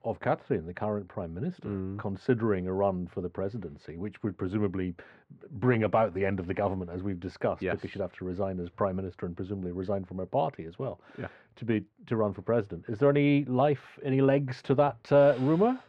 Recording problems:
muffled; very; fading above 1.5 kHz

